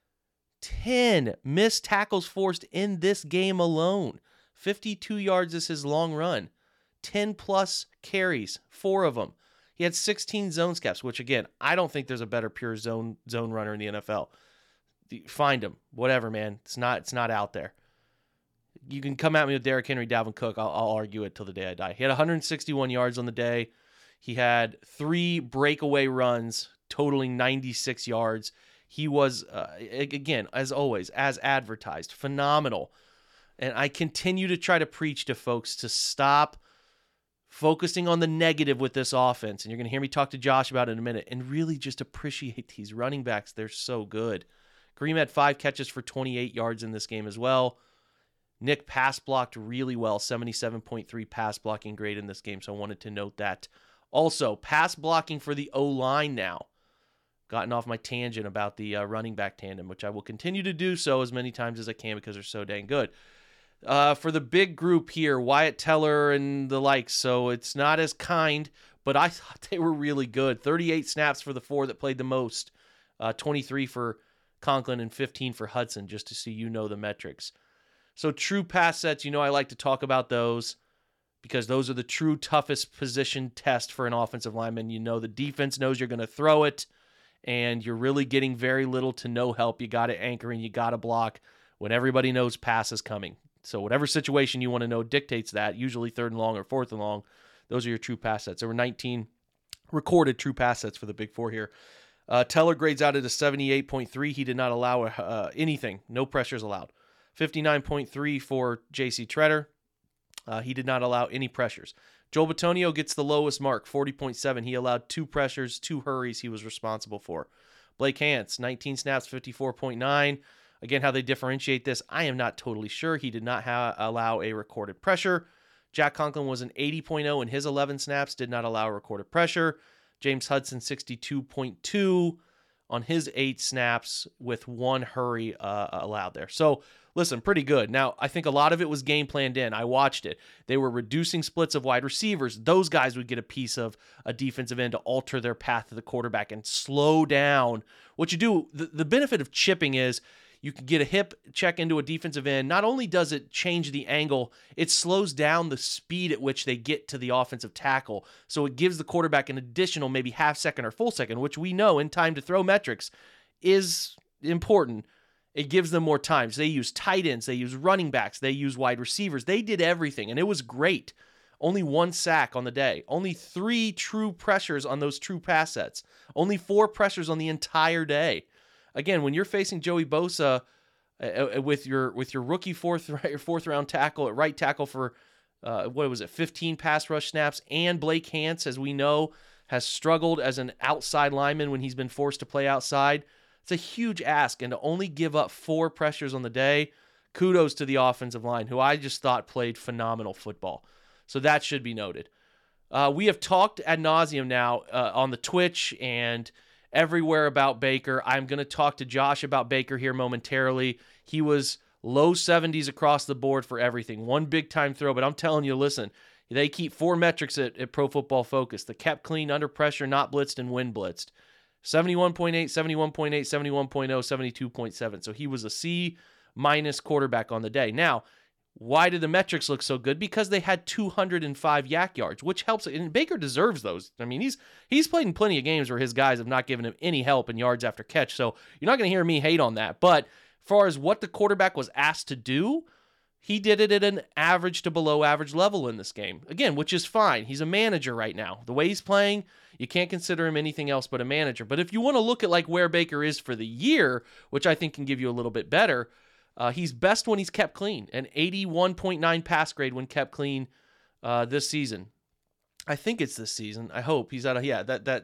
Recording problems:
none

